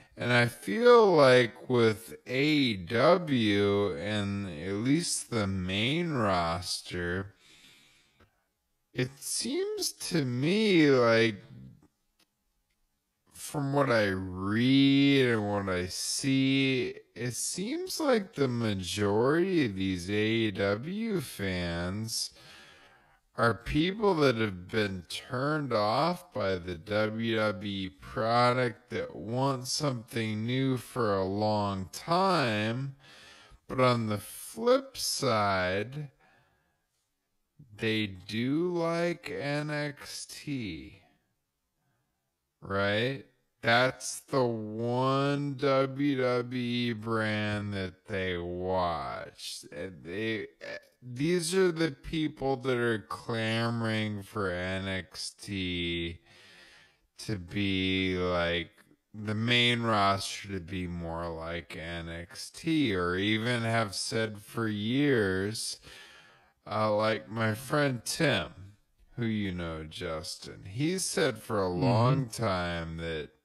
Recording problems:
wrong speed, natural pitch; too slow; 0.5 times normal speed

